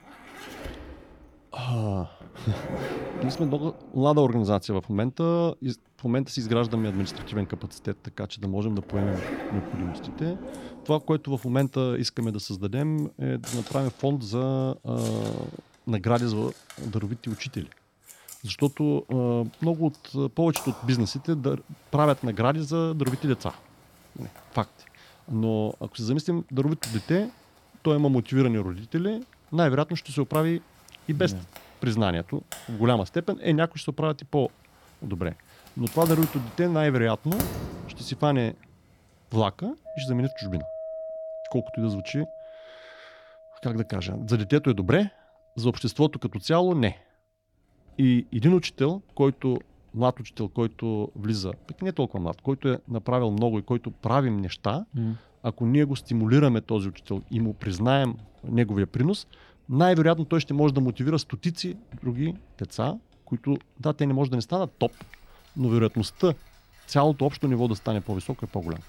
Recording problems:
household noises; noticeable; throughout; 15 dB below the speech

